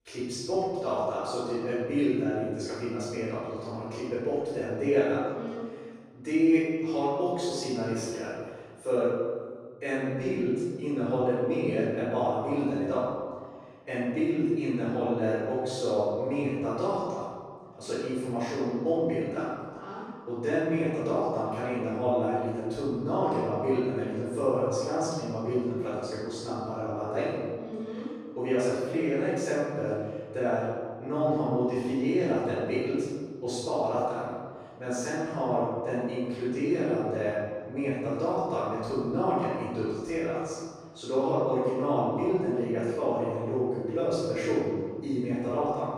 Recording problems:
room echo; strong; dies away in 1.7 s
off-mic speech; far

